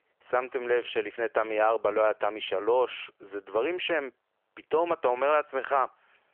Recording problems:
phone-call audio; nothing above 3 kHz

